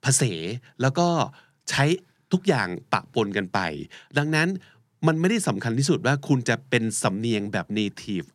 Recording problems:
none

